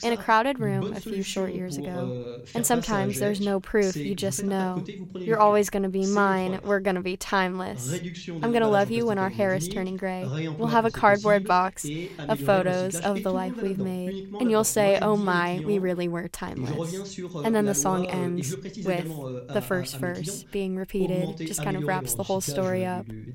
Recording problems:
voice in the background; loud; throughout; 9 dB below the speech

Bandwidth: 16 kHz